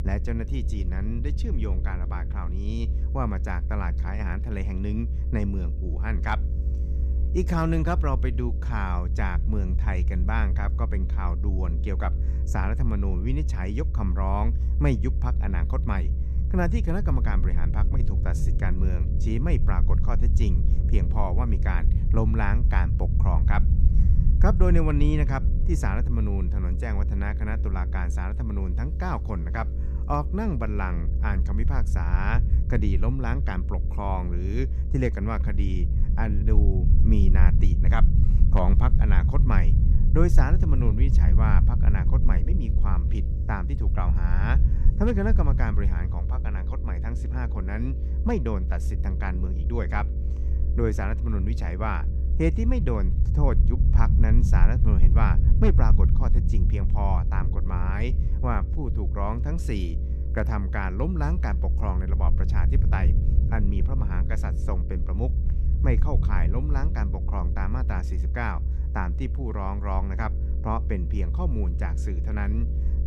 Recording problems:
low rumble; loud; throughout; 9 dB below the speech
electrical hum; noticeable; throughout; 50 Hz, 20 dB below the speech

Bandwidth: 14.5 kHz